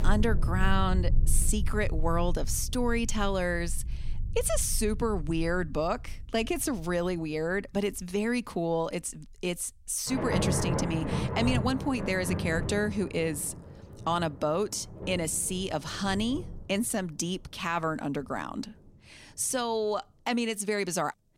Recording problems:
rain or running water; loud; throughout; 4 dB below the speech

